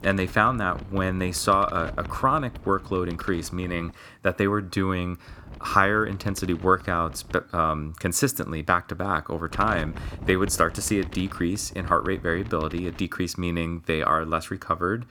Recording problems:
wind noise on the microphone; occasional gusts; until 4 s, from 5.5 to 7.5 s and from 9.5 to 13 s; 20 dB below the speech

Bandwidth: 18.5 kHz